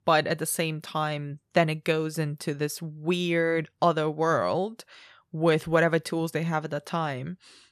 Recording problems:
none

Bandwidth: 14 kHz